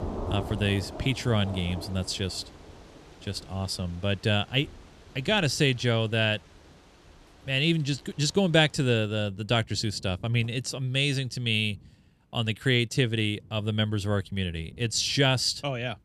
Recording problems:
rain or running water; noticeable; throughout; 20 dB below the speech

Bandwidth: 13.5 kHz